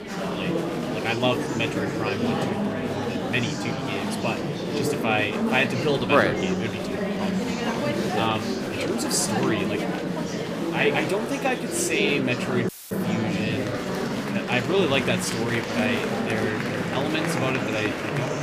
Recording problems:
murmuring crowd; loud; throughout; as loud as the speech
audio cutting out; filled with static; at 13 s

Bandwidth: 15 kHz